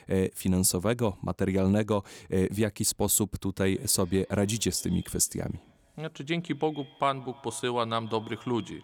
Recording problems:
echo of what is said; faint; from 3.5 s on; 140 ms later, 25 dB below the speech

